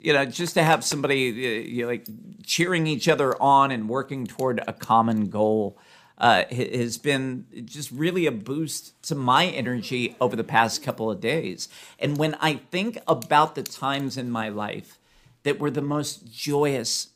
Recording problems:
household noises; faint; throughout; 20 dB below the speech

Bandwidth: 15 kHz